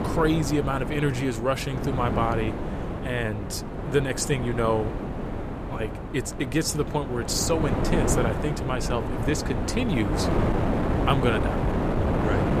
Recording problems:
wind noise on the microphone; heavy; 3 dB below the speech

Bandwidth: 14.5 kHz